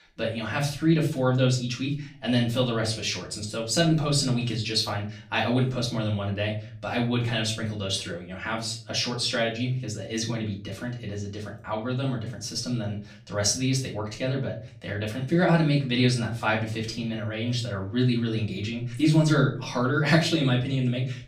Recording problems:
off-mic speech; far
room echo; slight; dies away in 0.4 s

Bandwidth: 15 kHz